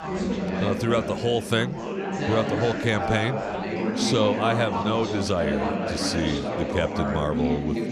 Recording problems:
chatter from many people; loud; throughout; 2 dB below the speech
train or aircraft noise; faint; from 2 s on; 30 dB below the speech

